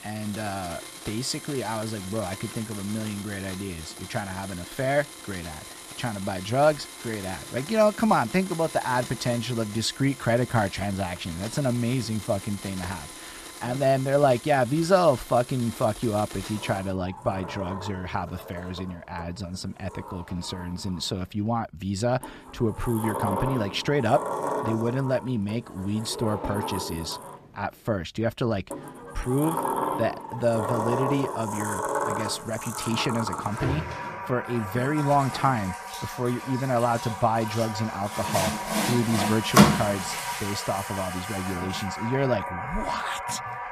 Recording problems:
household noises; loud; throughout; 5 dB below the speech

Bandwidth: 14.5 kHz